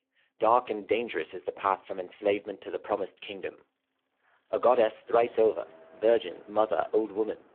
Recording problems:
phone-call audio; poor line
traffic noise; faint; throughout; 25 dB below the speech

